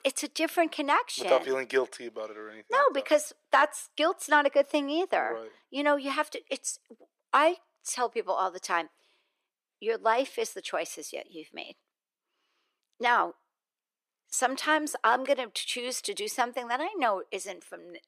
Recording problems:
thin; somewhat; fading below 400 Hz

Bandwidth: 14.5 kHz